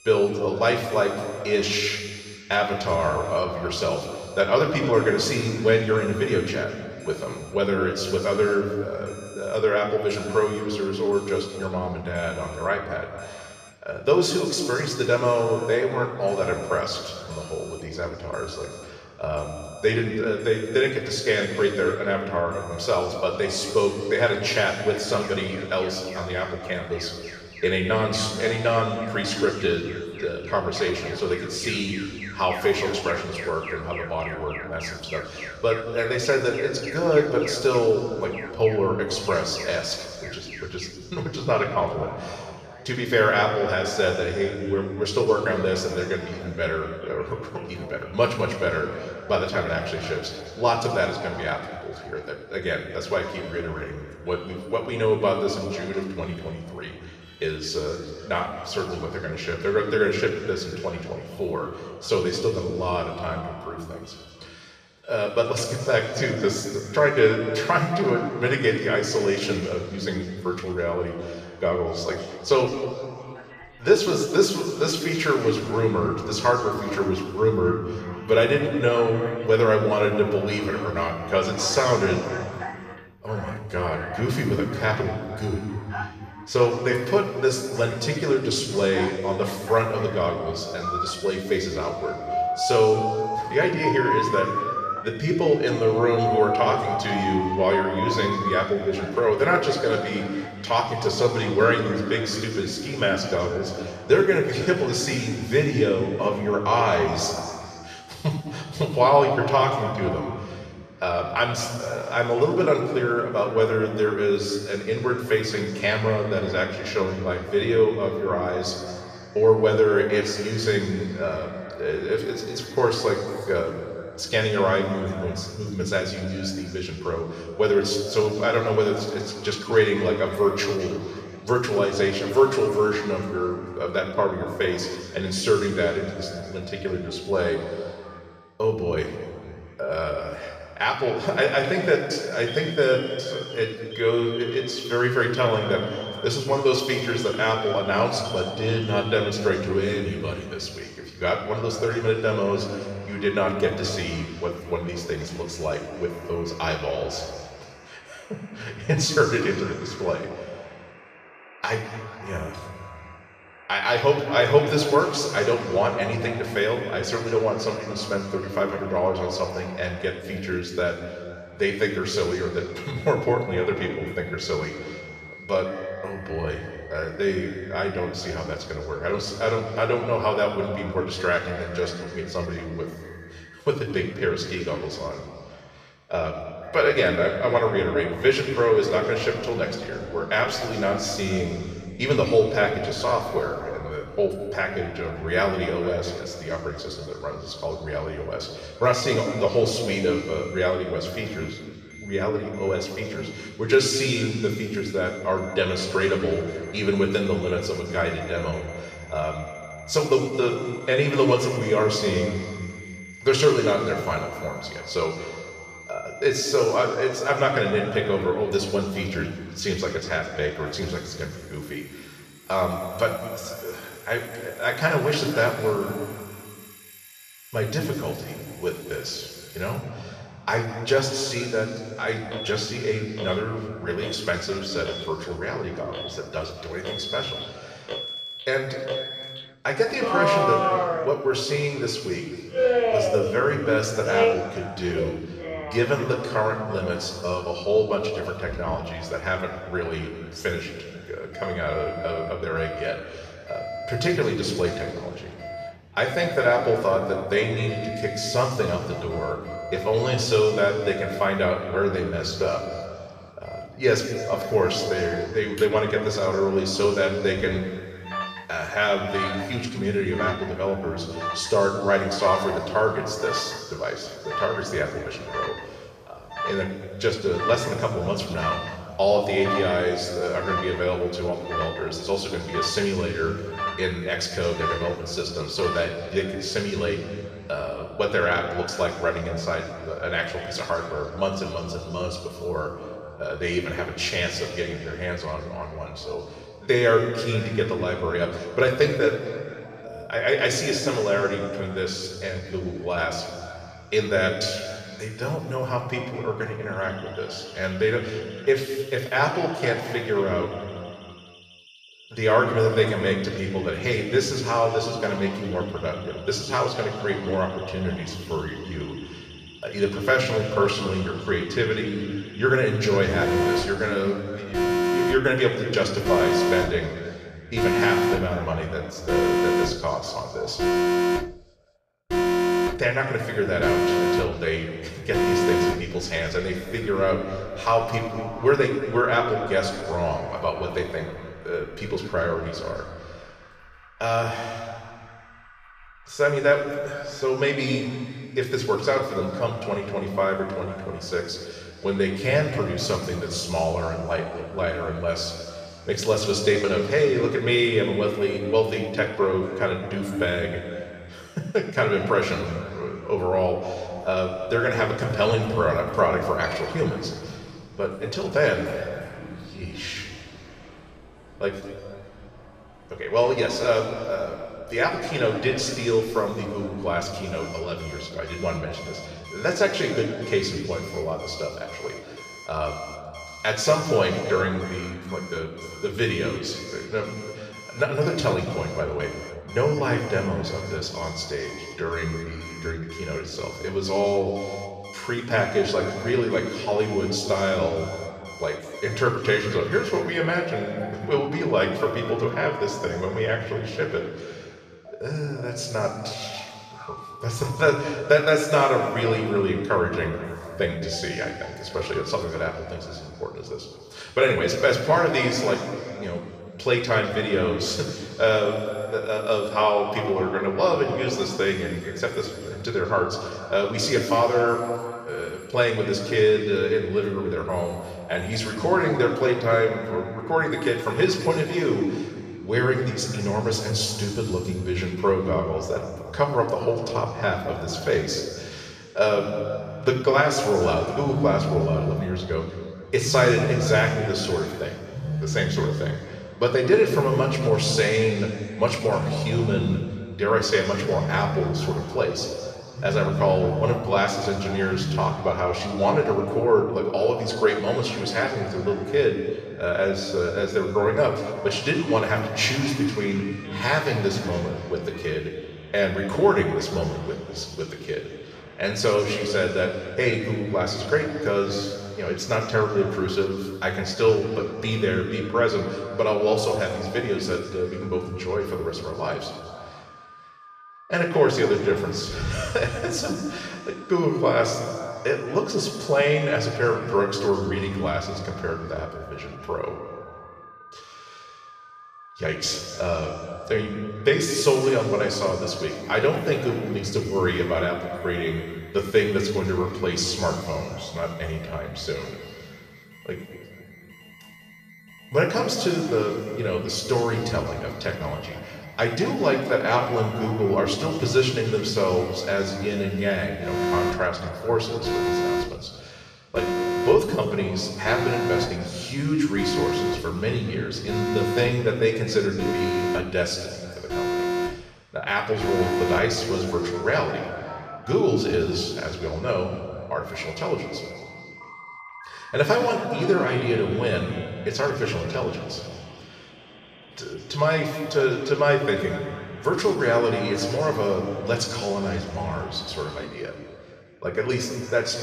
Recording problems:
off-mic speech; far
room echo; noticeable; dies away in 2.1 s
alarms or sirens; loud; throughout; 9 dB below the speech

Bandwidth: 14.5 kHz